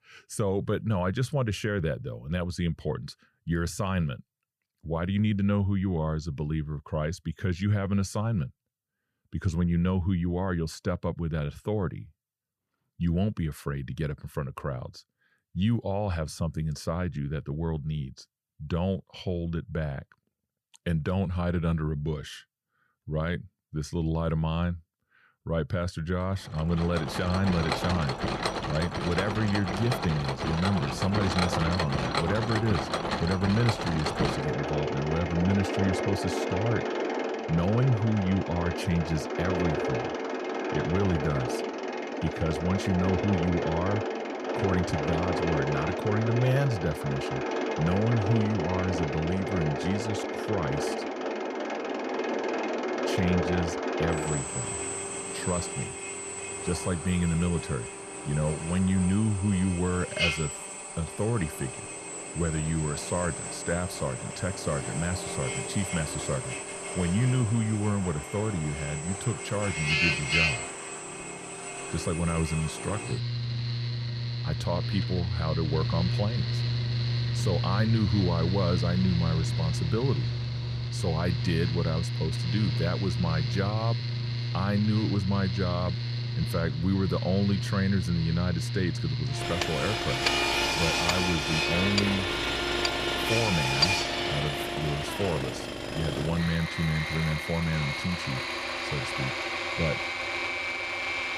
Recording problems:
machinery noise; loud; from 27 s on; 1 dB below the speech

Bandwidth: 15 kHz